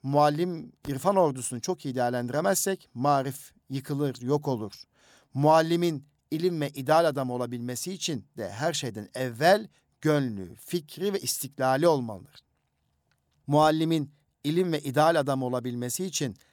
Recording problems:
none

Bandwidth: 18.5 kHz